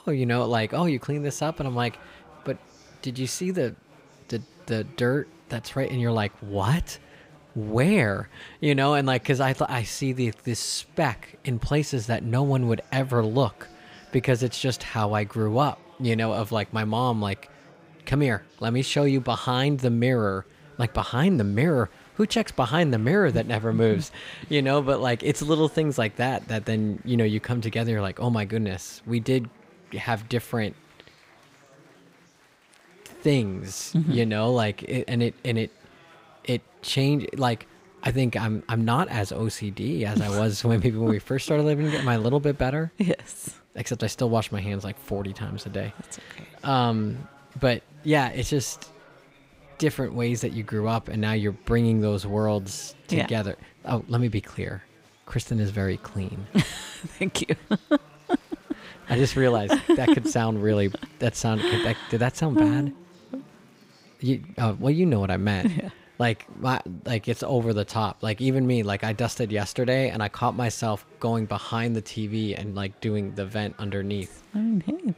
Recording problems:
chatter from many people; faint; throughout; 25 dB below the speech

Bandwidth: 15.5 kHz